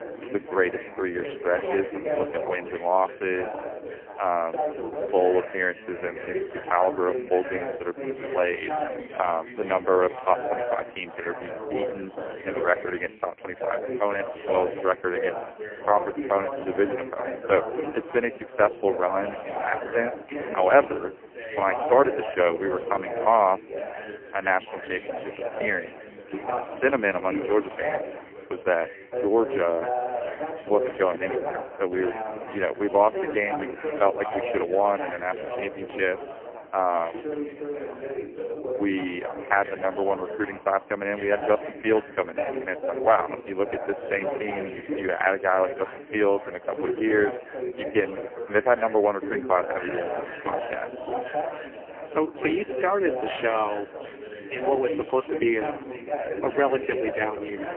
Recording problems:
phone-call audio; poor line; nothing above 3 kHz
background chatter; loud; throughout; 3 voices, 7 dB below the speech

